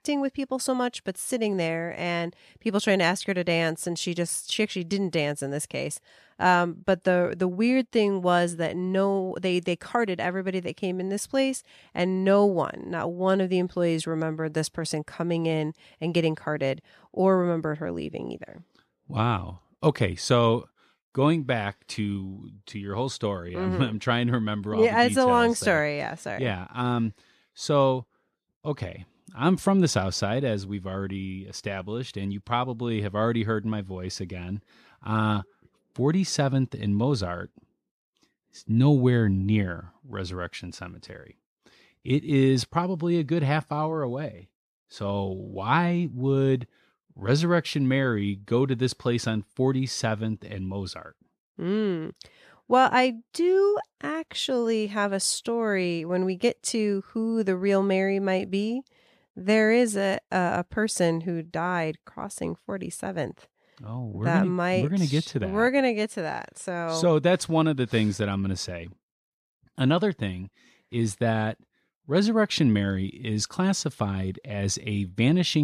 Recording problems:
abrupt cut into speech; at the end

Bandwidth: 14.5 kHz